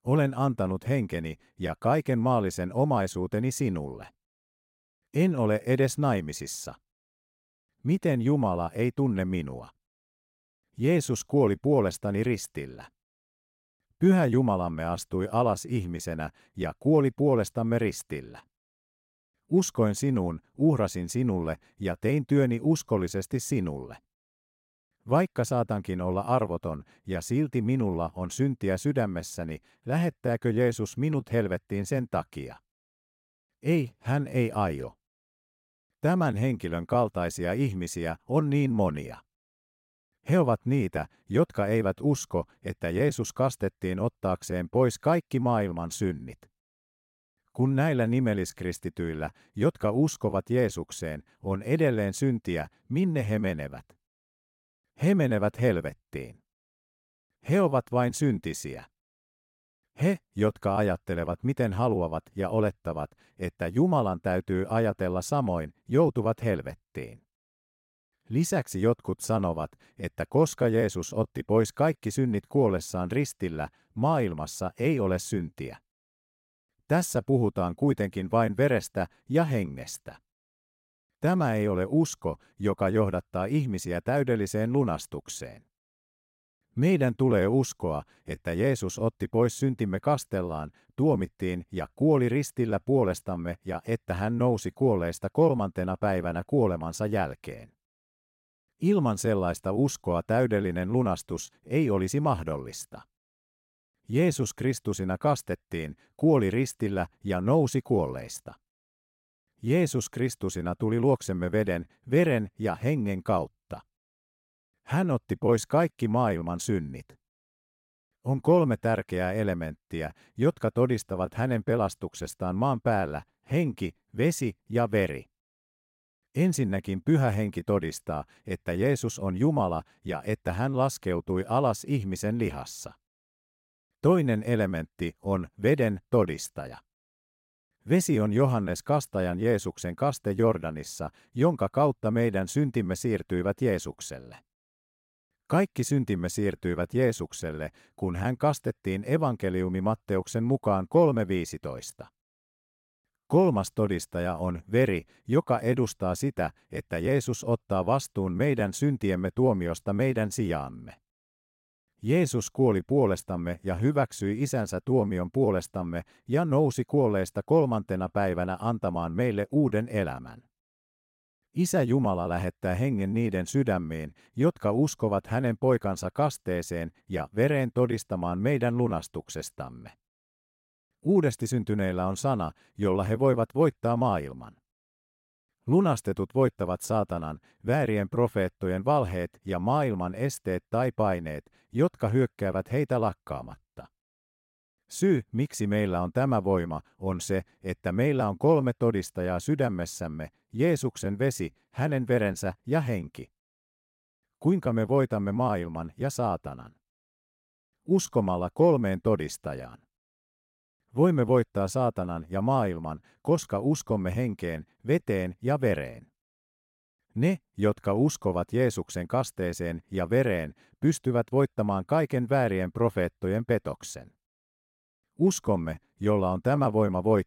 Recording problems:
none

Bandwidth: 16 kHz